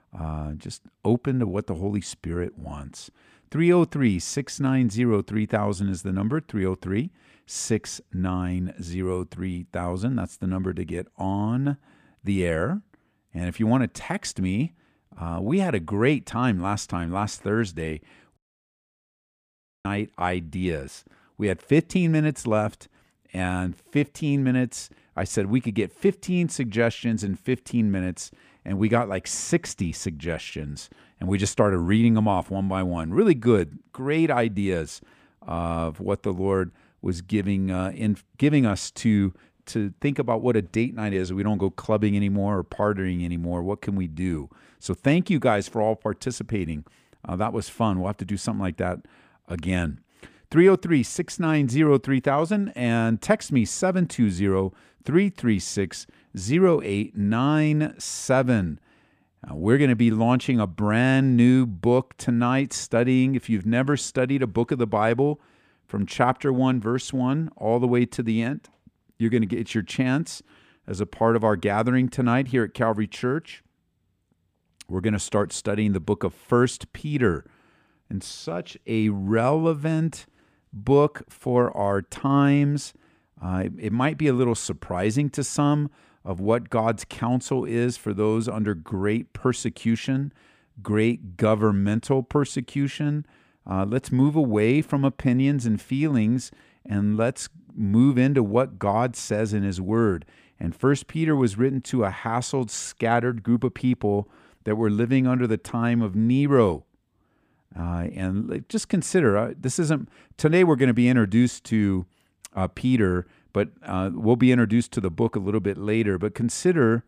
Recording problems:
audio cutting out; at 18 s for 1.5 s

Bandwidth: 15 kHz